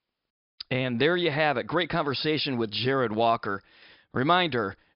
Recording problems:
high frequencies cut off; noticeable; nothing above 5.5 kHz

